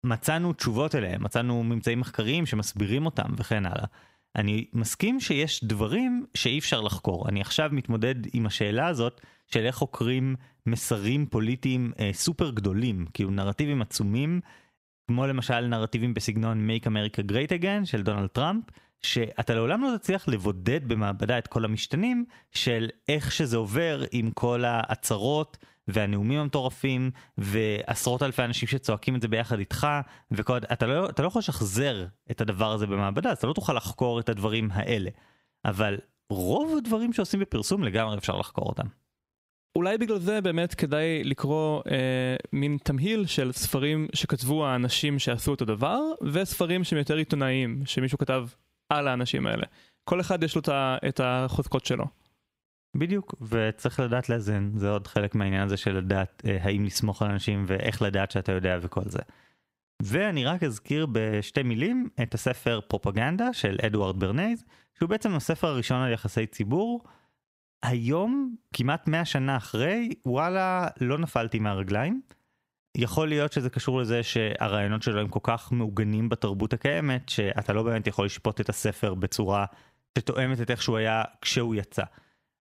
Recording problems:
squashed, flat; somewhat

